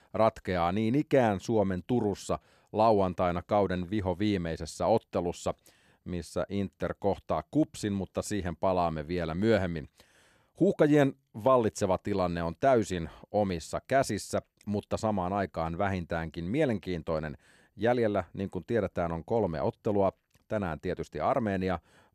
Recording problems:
none

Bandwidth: 13.5 kHz